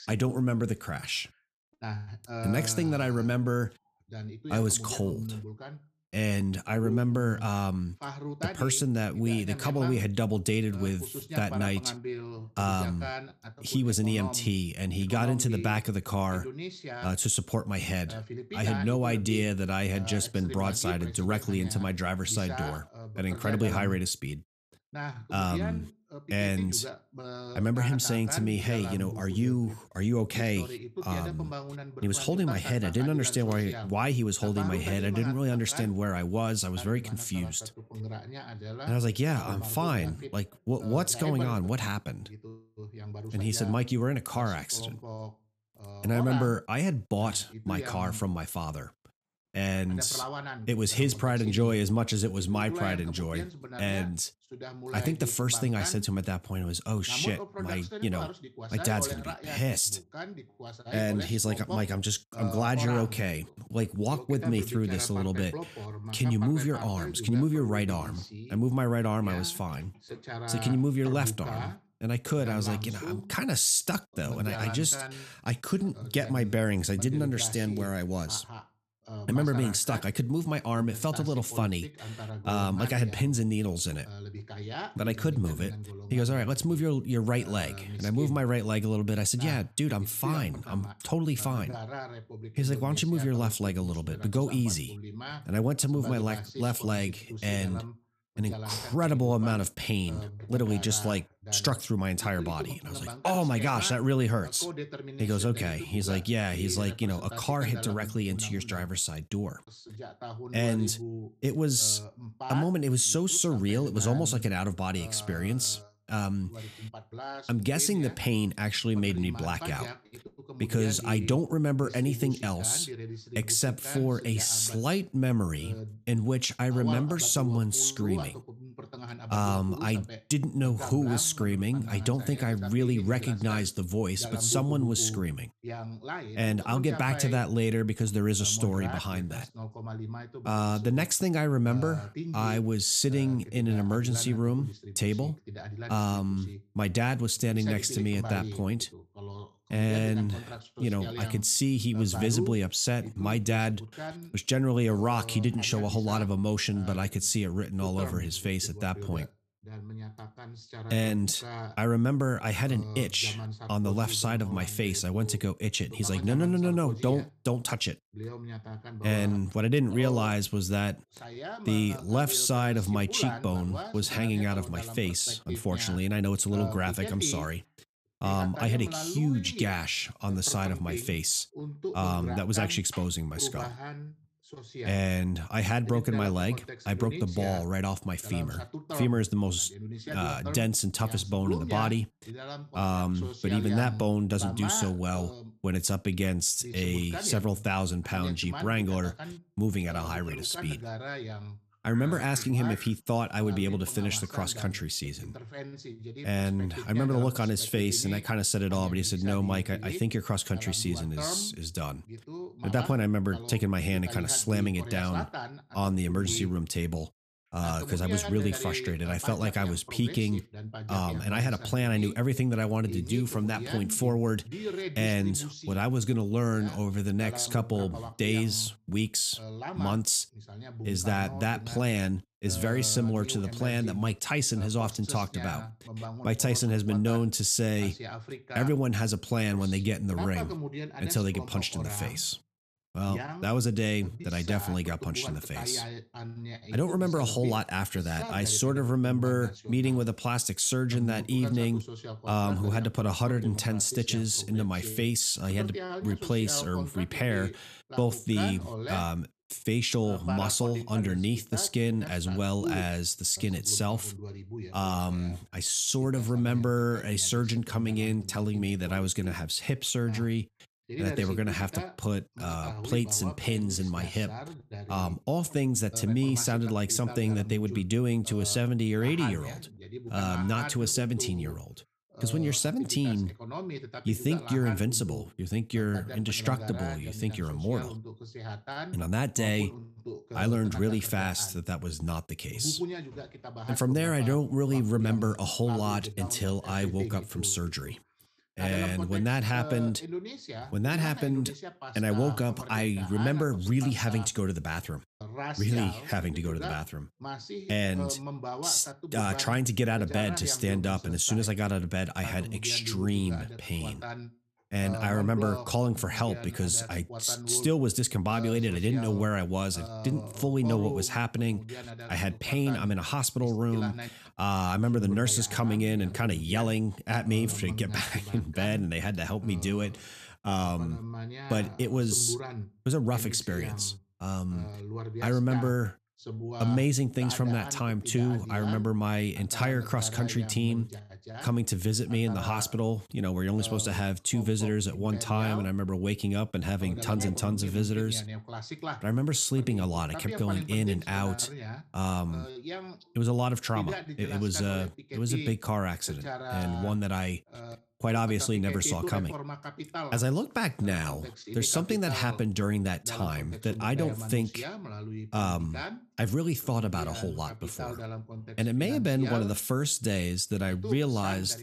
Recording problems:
voice in the background; noticeable; throughout; 10 dB below the speech

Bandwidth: 14.5 kHz